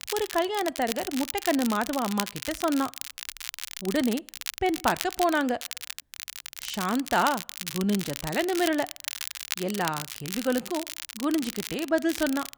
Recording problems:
crackle, like an old record; loud; 7 dB below the speech

